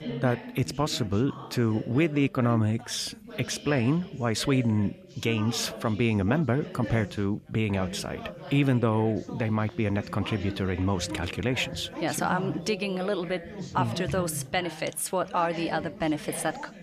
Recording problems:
background chatter; noticeable; throughout; 3 voices, 10 dB below the speech

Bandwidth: 14.5 kHz